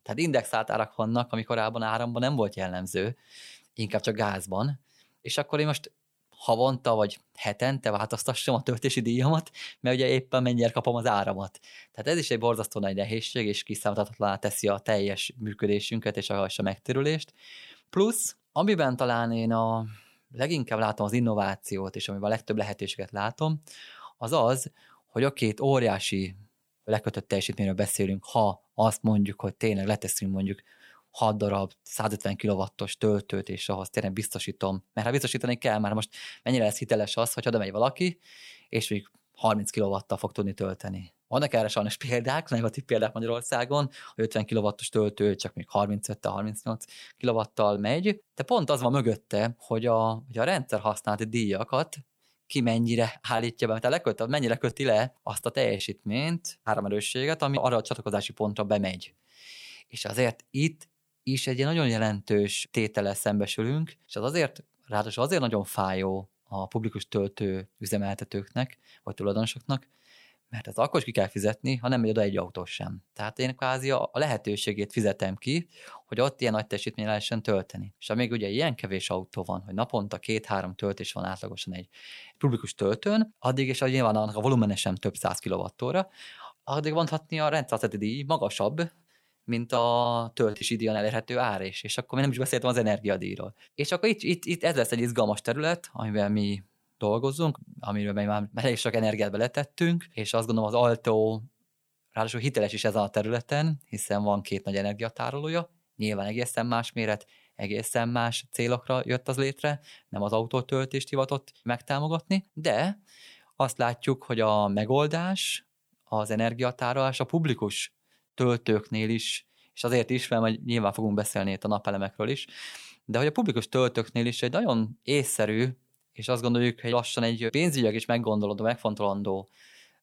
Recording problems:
choppy; very; from 1:30 to 1:31; 5% of the speech affected

